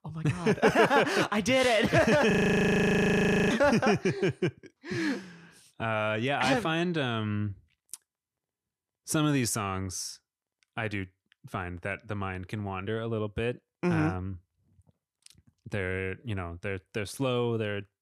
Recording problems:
audio freezing; at 2.5 s for 1 s

